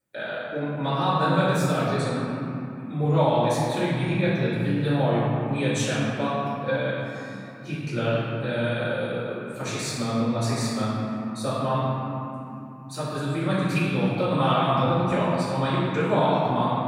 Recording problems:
room echo; strong; dies away in 3 s
off-mic speech; far

